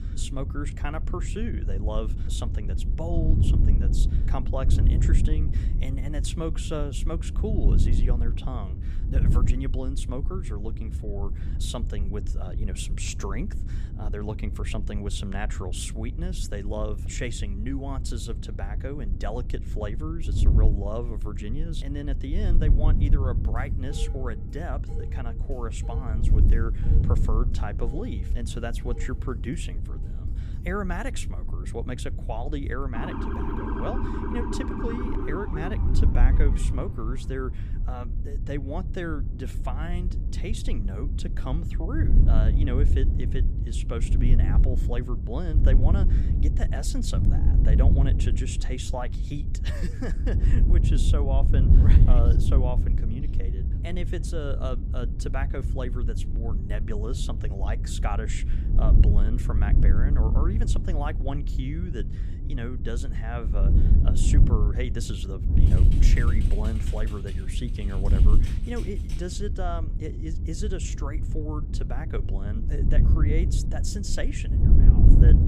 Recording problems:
wind noise on the microphone; heavy; 5 dB below the speech
clattering dishes; noticeable; from 24 to 31 s; peak 8 dB below the speech
siren; loud; from 33 to 37 s; peak 3 dB above the speech
keyboard typing; noticeable; from 1:06 to 1:09; peak 10 dB below the speech

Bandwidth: 15 kHz